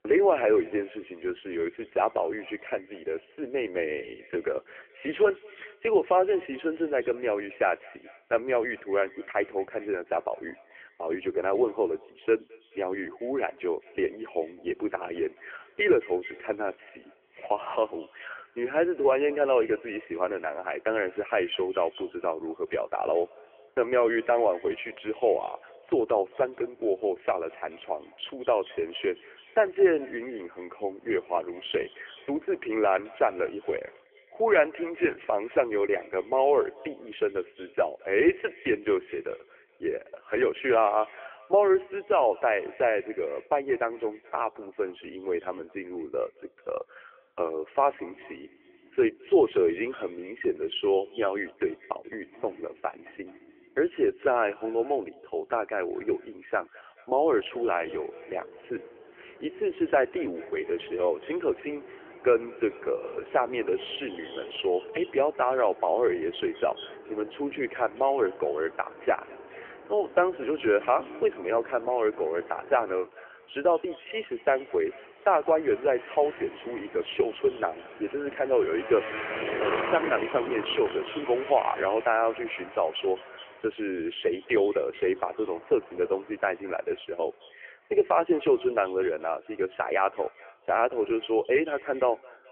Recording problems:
phone-call audio; poor line; nothing above 3 kHz
echo of what is said; faint; throughout; 210 ms later, 25 dB below the speech
traffic noise; noticeable; throughout; 15 dB below the speech

